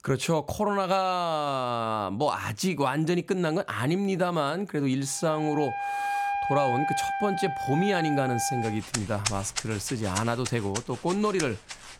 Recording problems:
background music; loud; from 5.5 s on; 4 dB below the speech

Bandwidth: 16.5 kHz